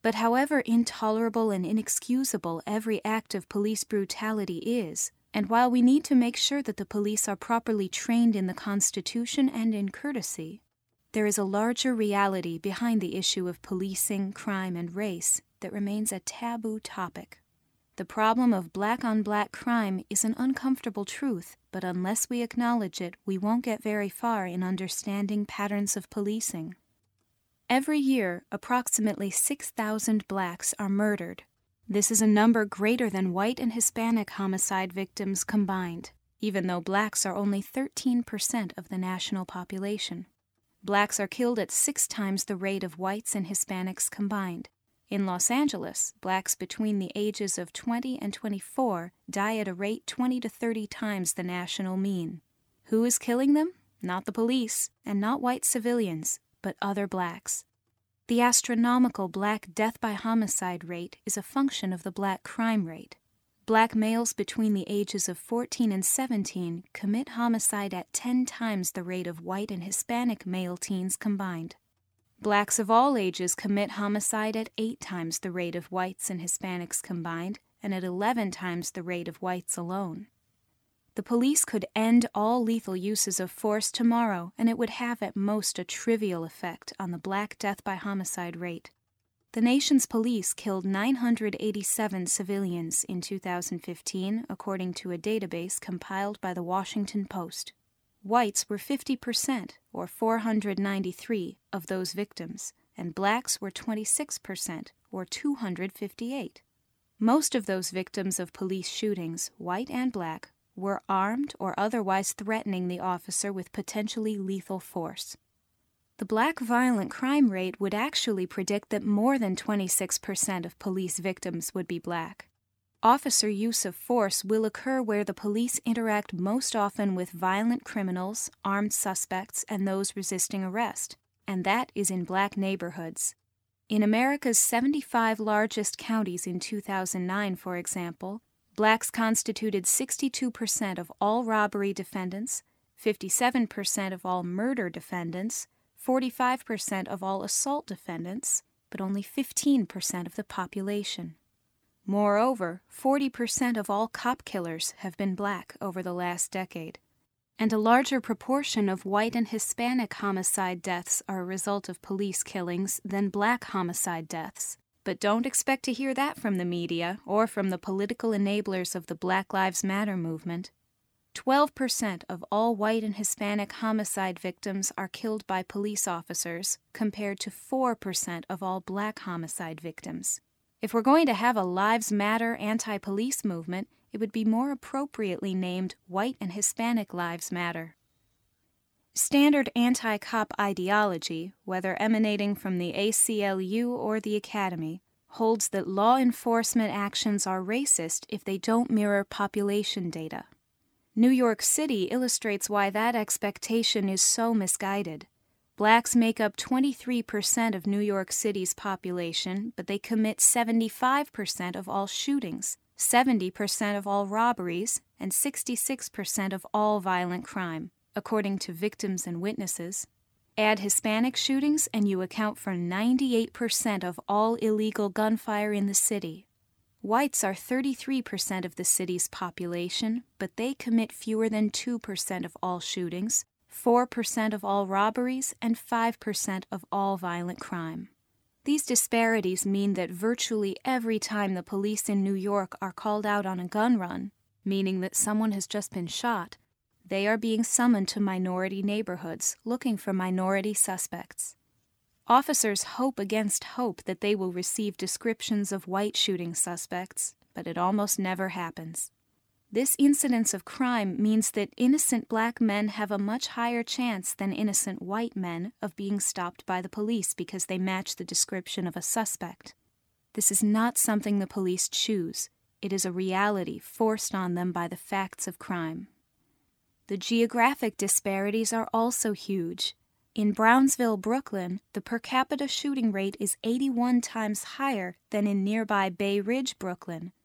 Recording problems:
none

